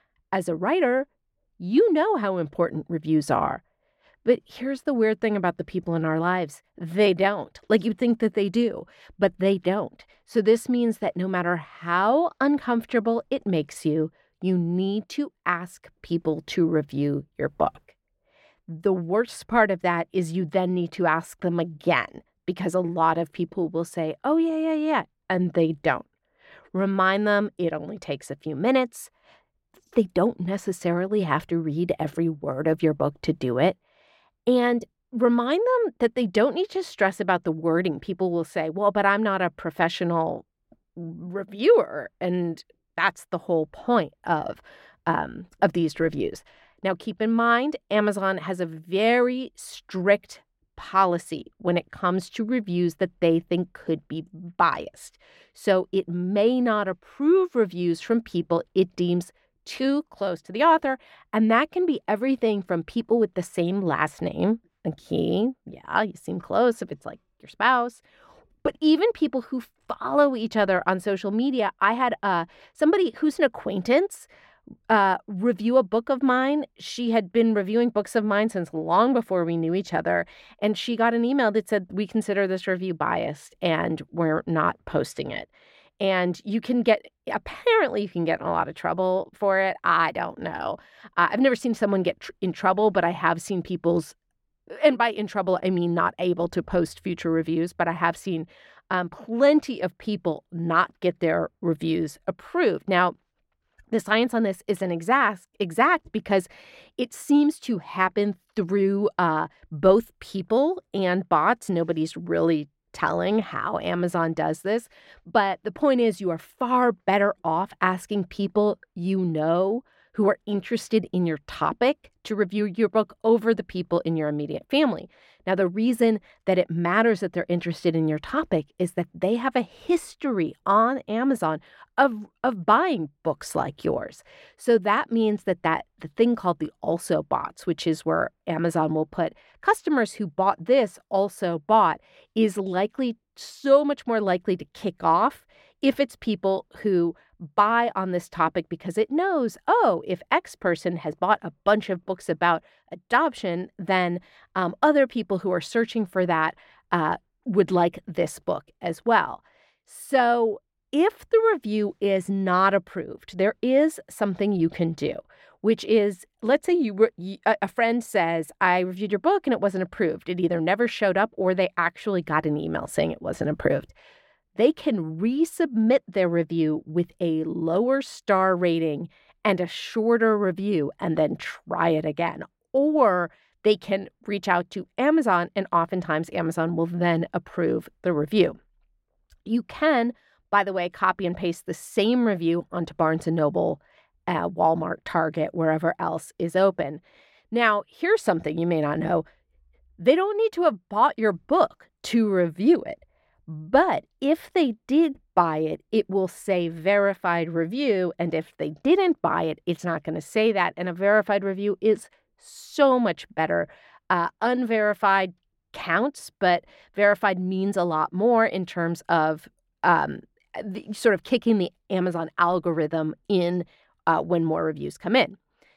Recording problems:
muffled; slightly; fading above 3.5 kHz

